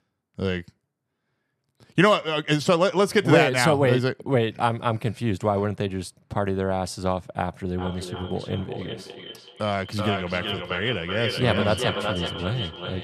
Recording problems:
echo of what is said; strong; from 8 s on; 380 ms later, 7 dB below the speech

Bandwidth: 13.5 kHz